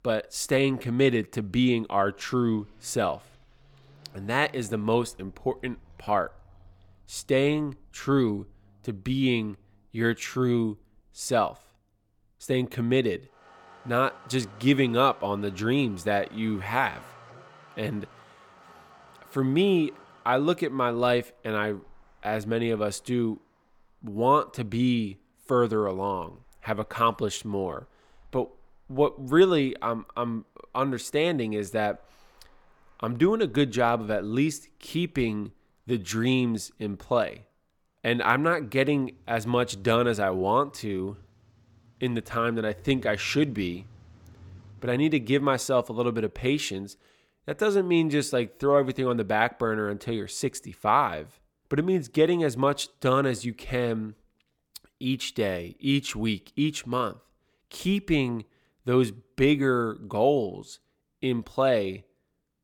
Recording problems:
traffic noise; faint; until 46 s; 30 dB below the speech

